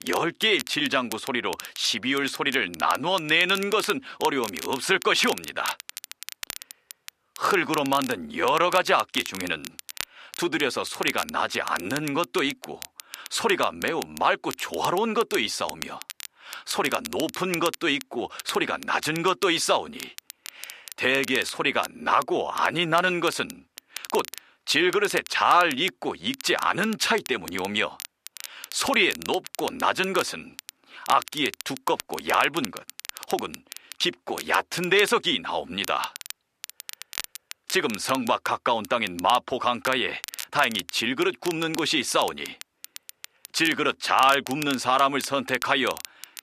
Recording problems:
crackle, like an old record; noticeable; 15 dB below the speech

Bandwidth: 14.5 kHz